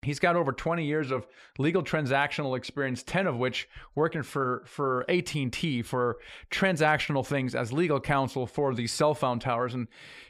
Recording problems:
none

